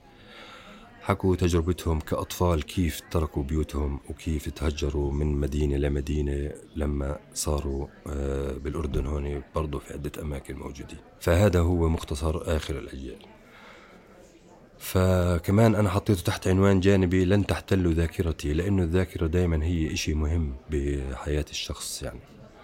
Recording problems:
murmuring crowd; faint; throughout; 25 dB below the speech

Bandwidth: 16 kHz